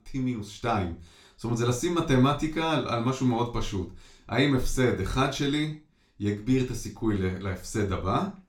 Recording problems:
off-mic speech; far
room echo; slight; dies away in 0.3 s

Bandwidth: 17 kHz